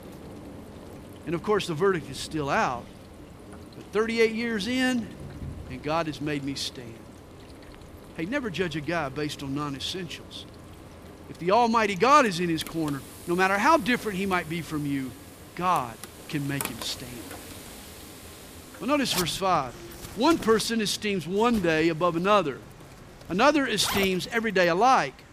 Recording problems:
household noises; noticeable; throughout; 15 dB below the speech
rain or running water; faint; throughout; 25 dB below the speech

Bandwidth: 15 kHz